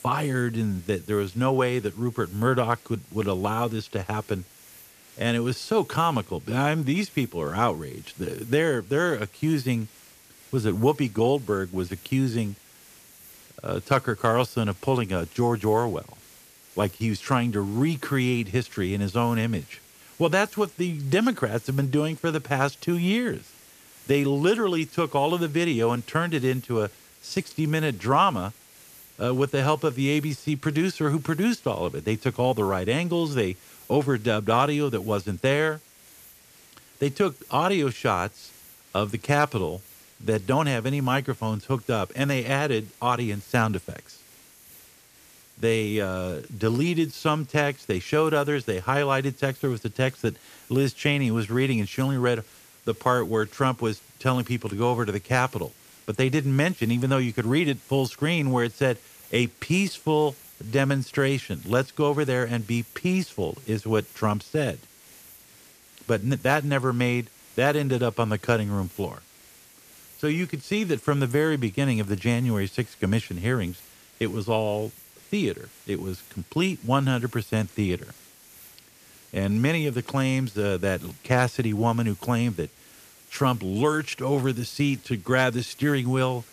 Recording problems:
hiss; faint; throughout; 25 dB below the speech

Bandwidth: 14.5 kHz